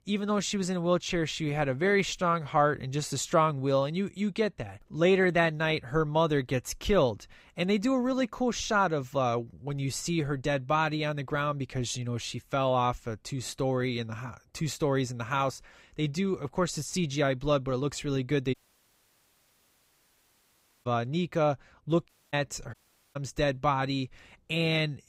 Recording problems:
audio cutting out; at 19 s for 2.5 s, at 22 s and at 23 s

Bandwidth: 15.5 kHz